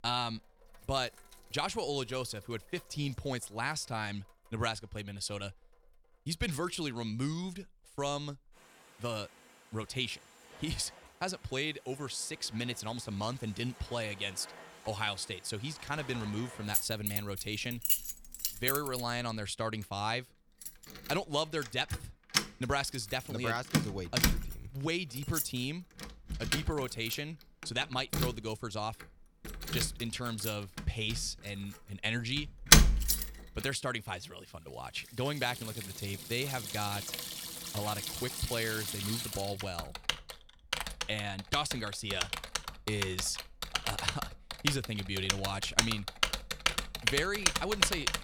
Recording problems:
household noises; very loud; throughout; 3 dB above the speech

